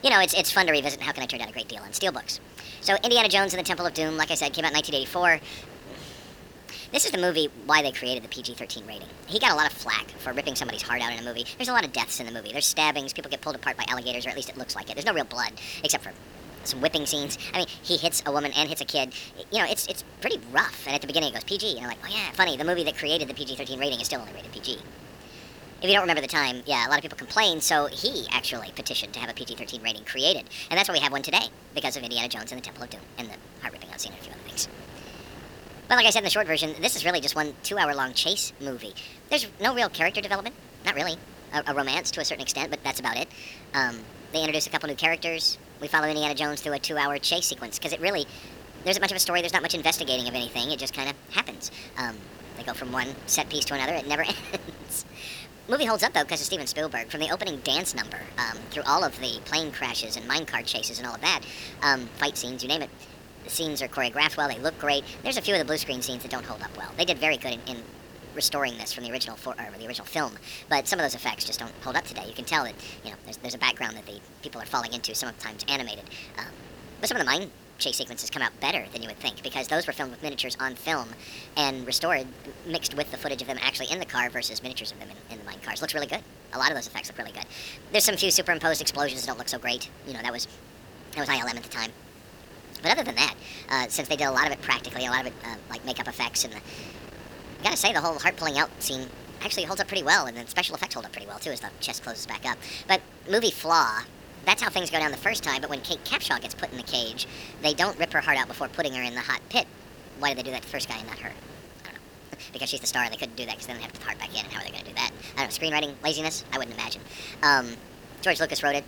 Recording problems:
wrong speed and pitch; too fast and too high; 1.5 times normal speed
thin; very slightly; fading below 900 Hz
wind noise on the microphone; occasional gusts; 20 dB below the speech
hiss; faint; throughout; 30 dB below the speech

